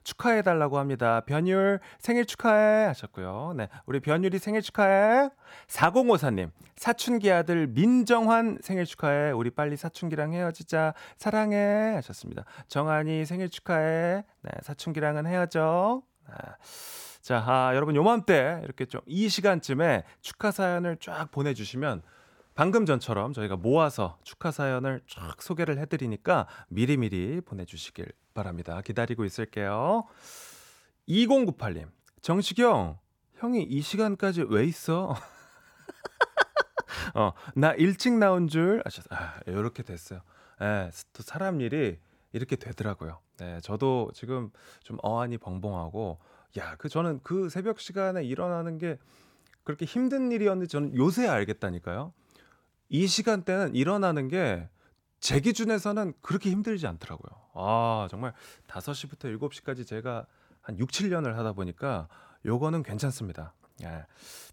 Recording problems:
none

